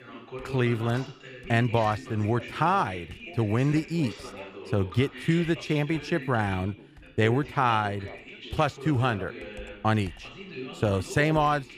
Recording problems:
background chatter; noticeable; throughout; 2 voices, 15 dB below the speech
household noises; faint; throughout; 30 dB below the speech

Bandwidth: 14.5 kHz